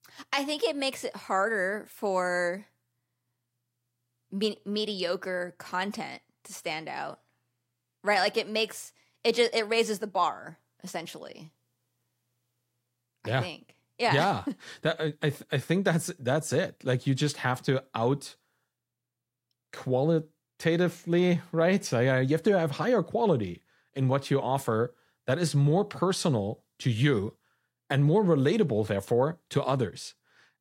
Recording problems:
none

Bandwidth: 16 kHz